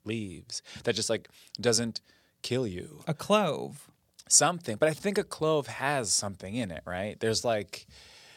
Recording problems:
none

